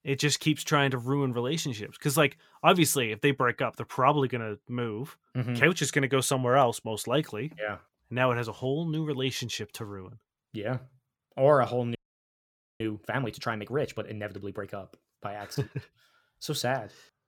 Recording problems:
audio freezing; at 12 s for 1 s

